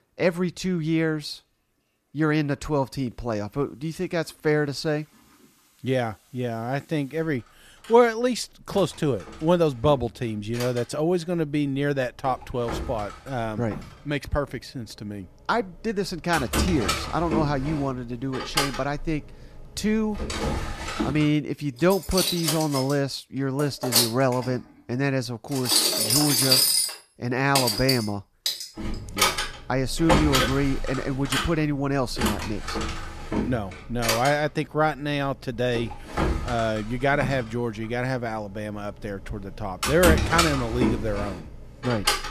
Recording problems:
household noises; very loud; throughout; 1 dB above the speech

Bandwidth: 14.5 kHz